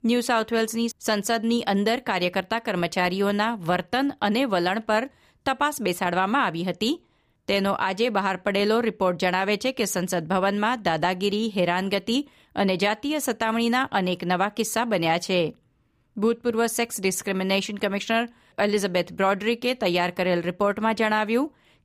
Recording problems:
none

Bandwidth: 15 kHz